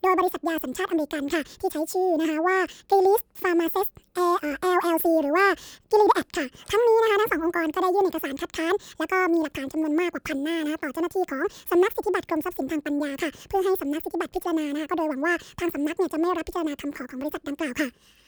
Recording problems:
wrong speed and pitch; too fast and too high; 1.6 times normal speed

